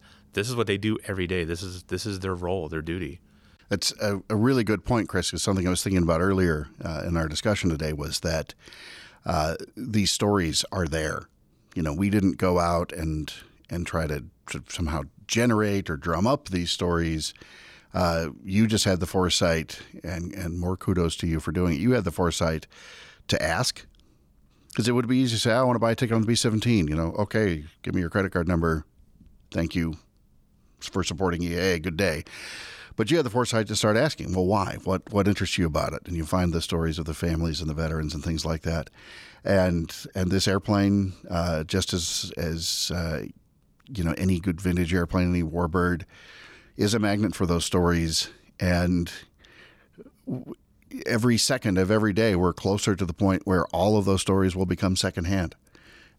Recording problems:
none

